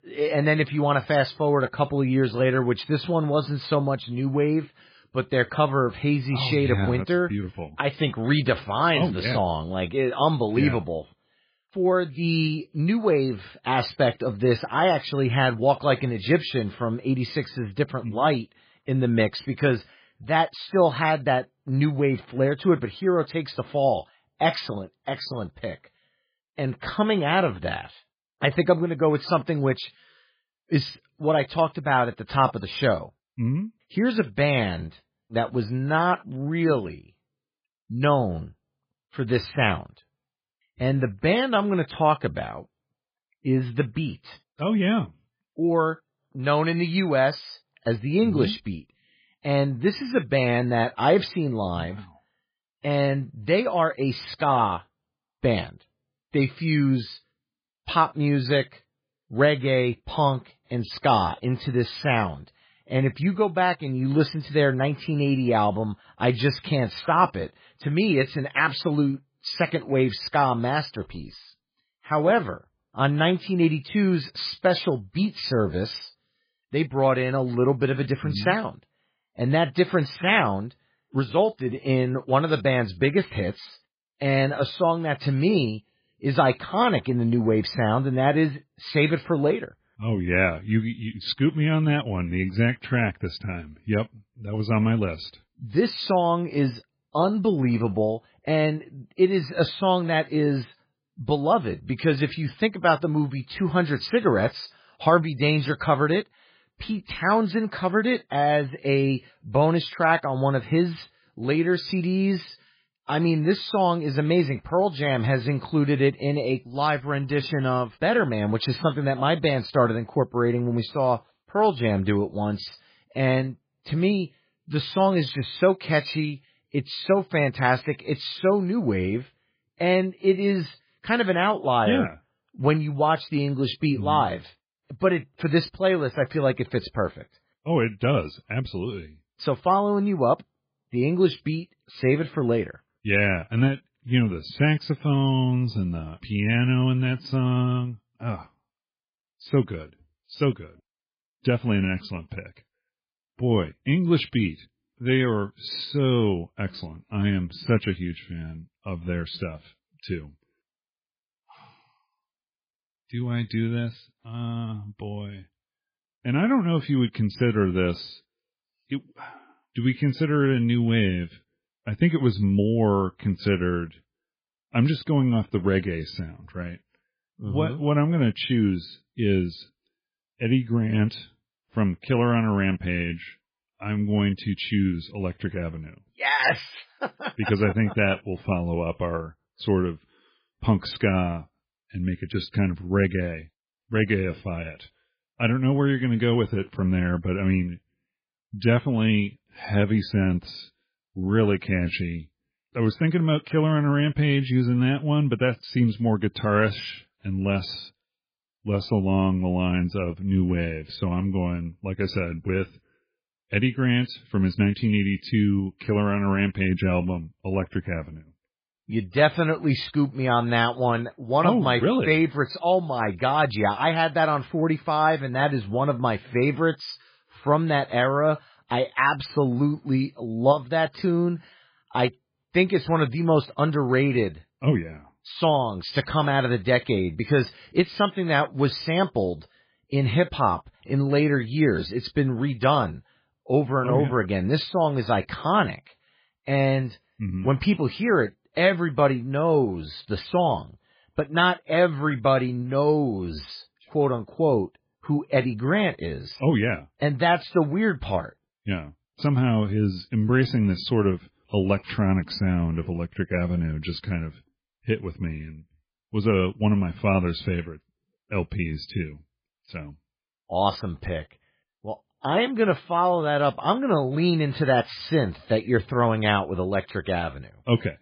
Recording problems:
garbled, watery; badly; nothing above 5 kHz

